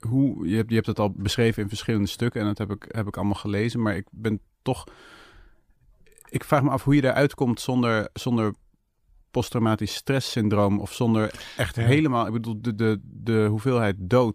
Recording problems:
none

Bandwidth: 15 kHz